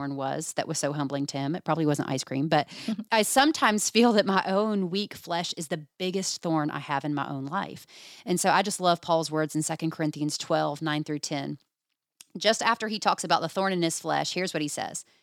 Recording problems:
abrupt cut into speech; at the start

